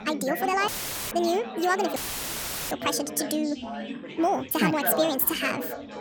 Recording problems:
wrong speed and pitch; too fast and too high; 1.6 times normal speed
background chatter; loud; throughout; 4 voices, 8 dB below the speech
audio cutting out; filled with static; at 0.5 s and at 2 s for 1 s

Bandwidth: 18 kHz